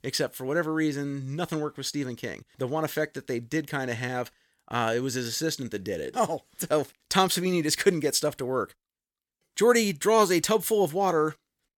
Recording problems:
none

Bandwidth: 17.5 kHz